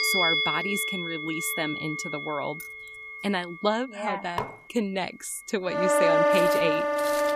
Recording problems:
background music; very loud; throughout; 5 dB above the speech
jangling keys; faint; at 2.5 s; peak 15 dB below the speech
clattering dishes; noticeable; at 4.5 s; peak 4 dB below the speech
footsteps; noticeable; from 6.5 s on; peak 7 dB below the speech

